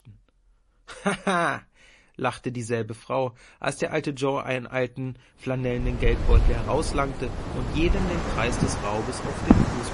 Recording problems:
distortion; slight; 10 dB below the speech
garbled, watery; slightly; nothing above 10.5 kHz
wind in the background; very loud; from 6 s on; 2 dB above the speech
high-pitched whine; very faint; throughout; 10.5 kHz, 45 dB below the speech

